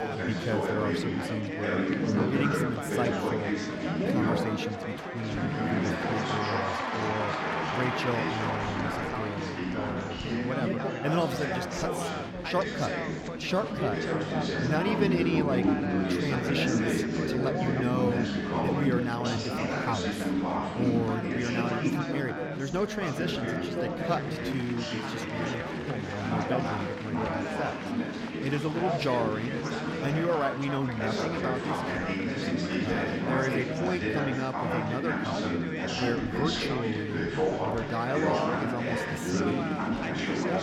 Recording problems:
chatter from many people; very loud; throughout; 3 dB above the speech
alarms or sirens; faint; until 12 s; 25 dB below the speech

